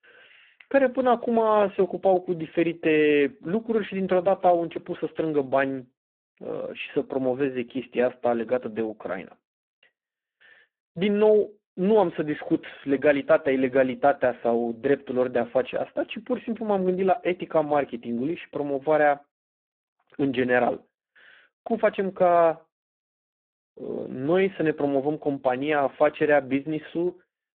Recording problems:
phone-call audio; poor line

